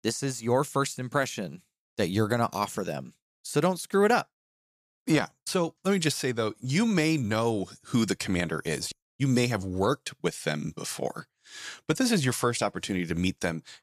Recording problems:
none

